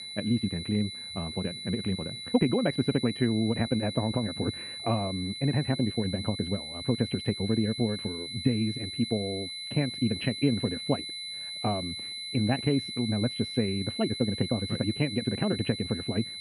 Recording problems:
muffled; very; fading above 2.5 kHz
wrong speed, natural pitch; too fast; 1.8 times normal speed
high-pitched whine; loud; throughout; 4 kHz, 6 dB below the speech

